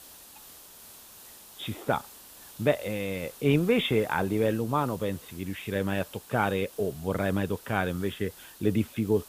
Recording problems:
high frequencies cut off; severe; nothing above 4 kHz
hiss; noticeable; throughout; 20 dB below the speech
clattering dishes; very faint; at 0.5 s; peak 35 dB below the speech

